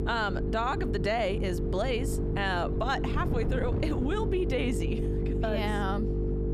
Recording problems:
squashed, flat; somewhat
electrical hum; loud; throughout; 50 Hz, 7 dB below the speech
wind noise on the microphone; occasional gusts; 15 dB below the speech

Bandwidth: 14.5 kHz